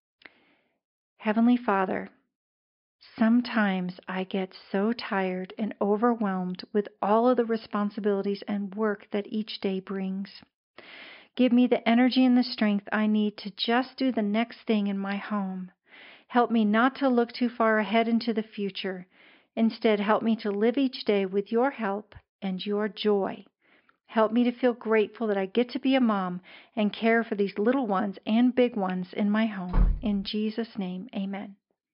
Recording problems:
high frequencies cut off; noticeable; nothing above 5.5 kHz
door banging; noticeable; at 30 s; peak 2 dB below the speech

